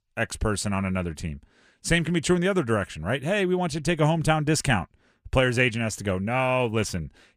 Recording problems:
none

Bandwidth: 15 kHz